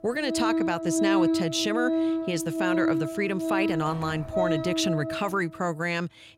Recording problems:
background music; very loud; until 4.5 s; 1 dB above the speech

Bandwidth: 16 kHz